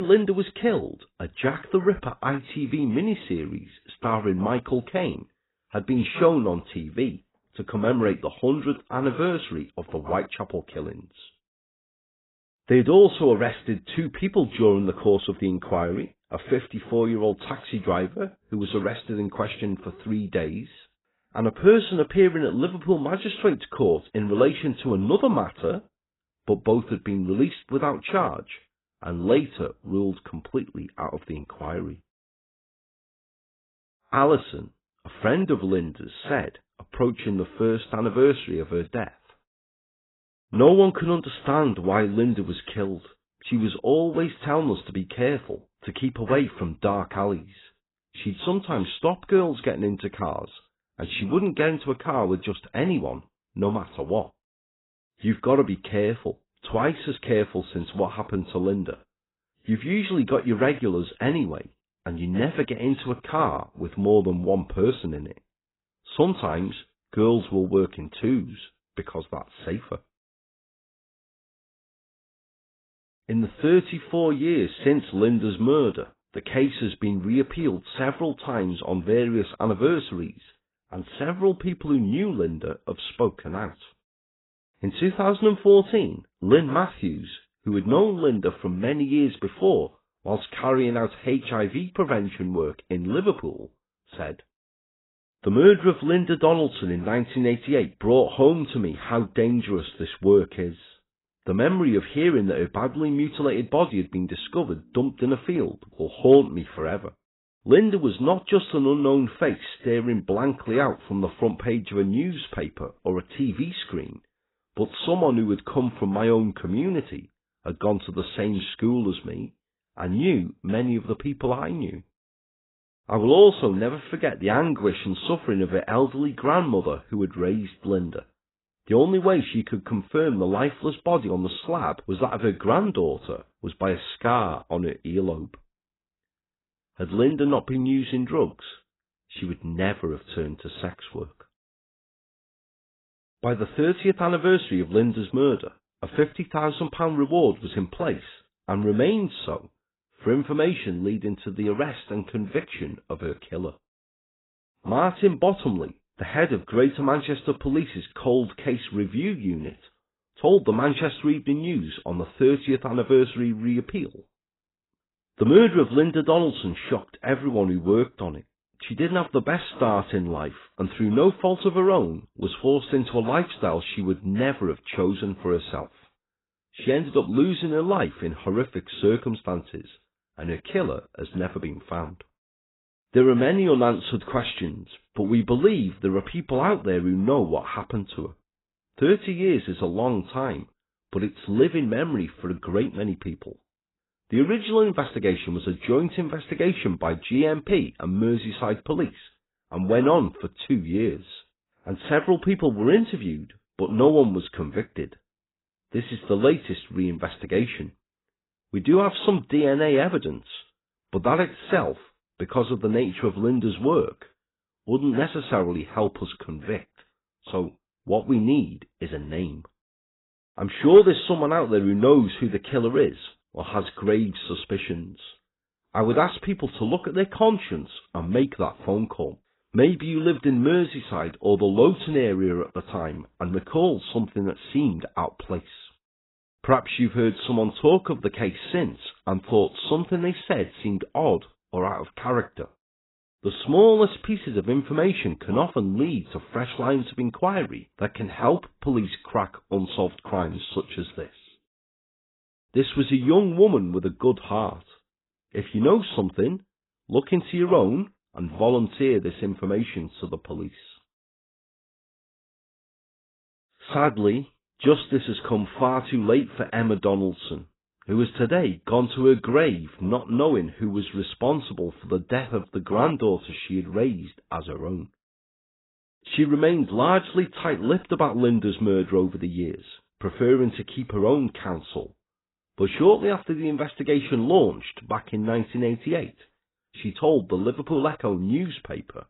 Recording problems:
garbled, watery; badly; nothing above 4 kHz
abrupt cut into speech; at the start

